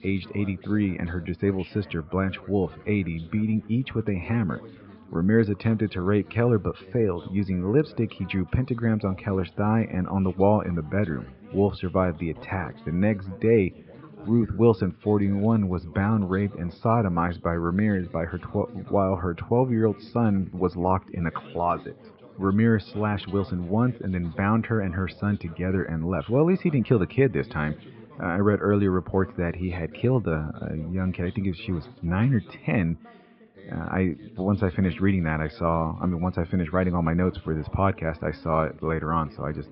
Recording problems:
high frequencies cut off; noticeable; nothing above 5.5 kHz
muffled; very slightly; fading above 3 kHz
background chatter; faint; throughout; 3 voices, 20 dB below the speech

